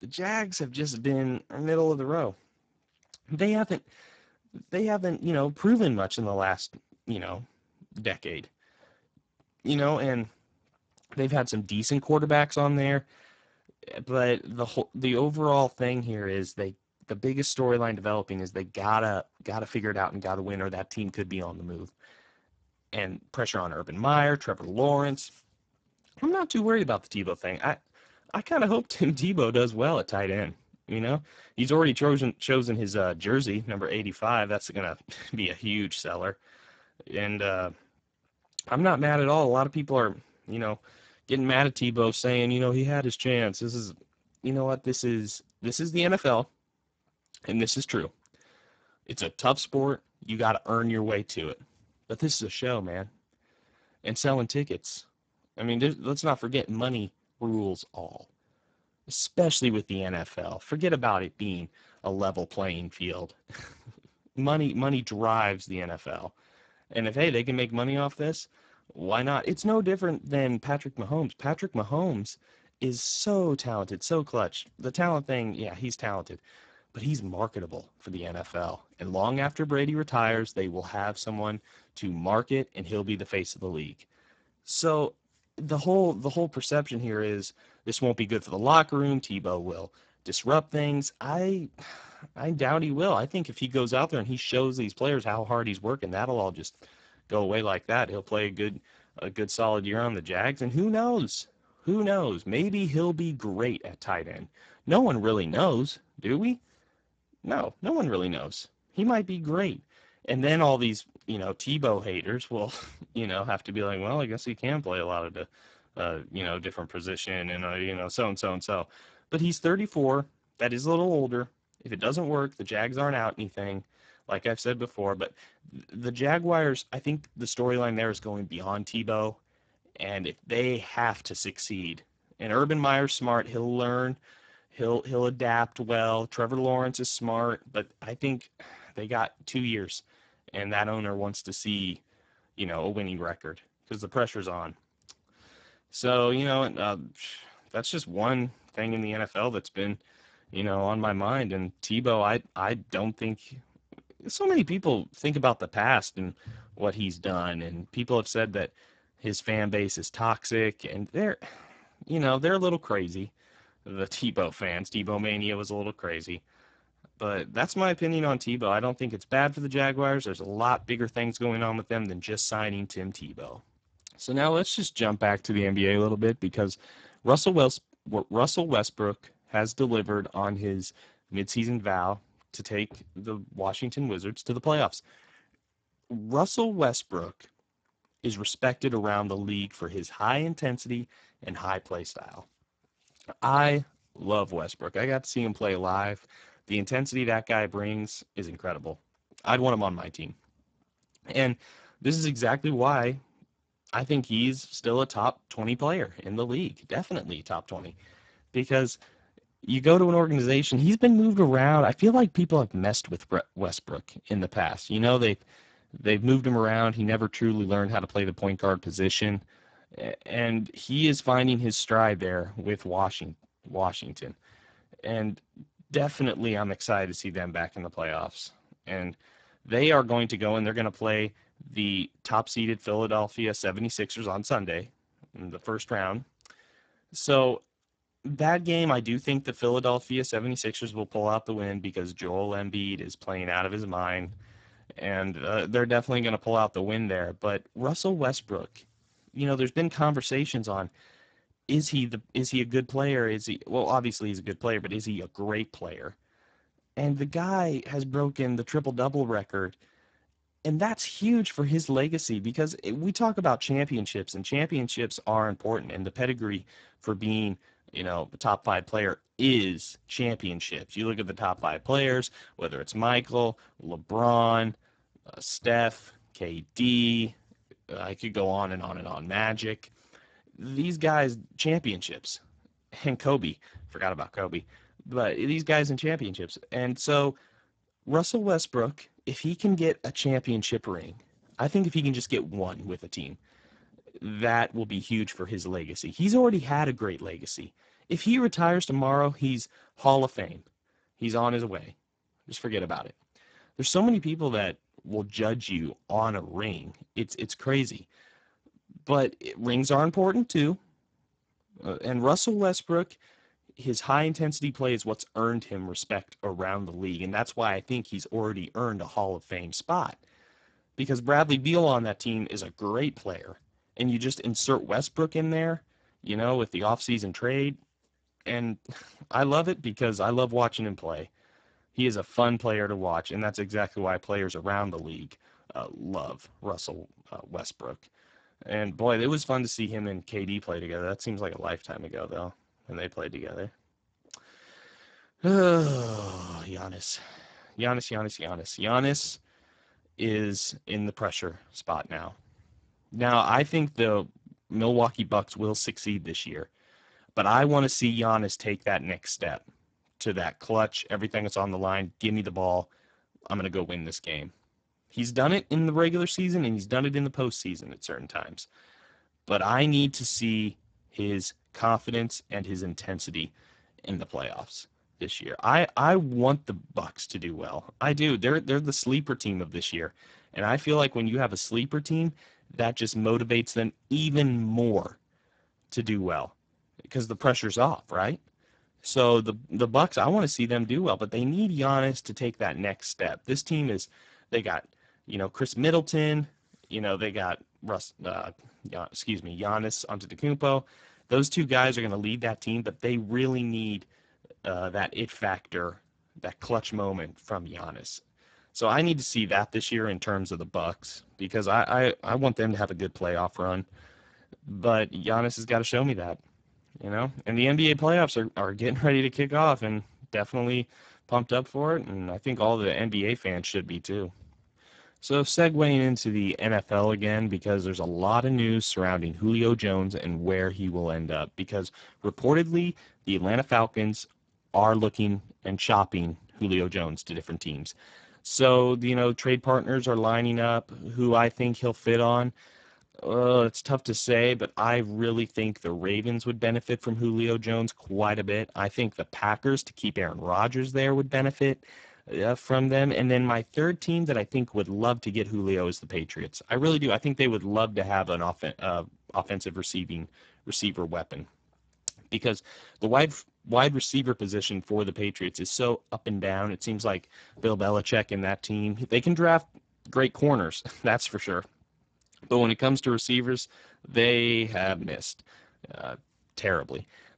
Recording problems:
garbled, watery; badly; nothing above 8 kHz

